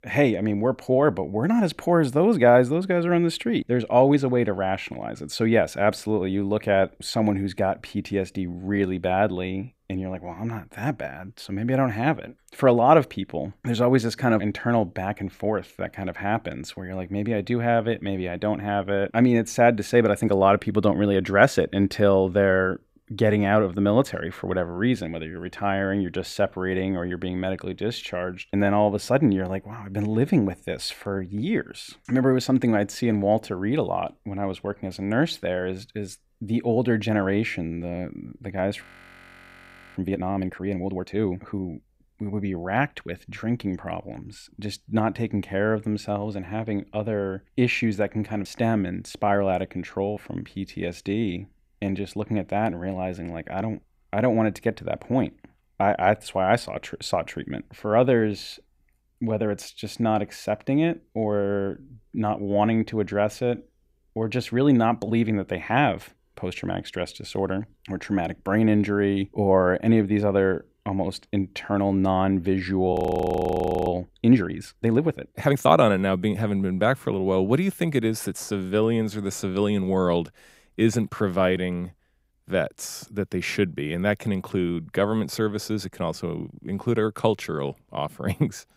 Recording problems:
audio freezing; at 39 s for 1 s and at 1:13 for 1 s

